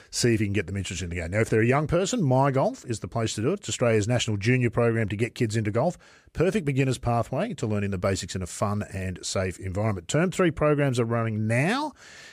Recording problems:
none

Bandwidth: 14.5 kHz